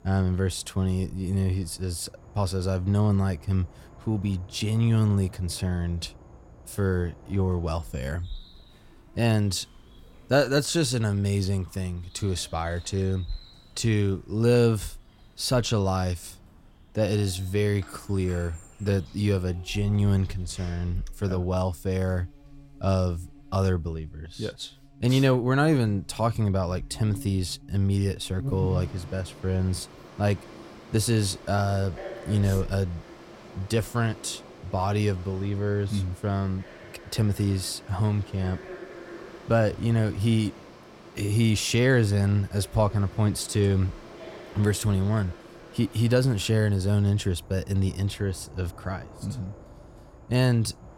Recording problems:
animal sounds; noticeable; throughout; 20 dB below the speech

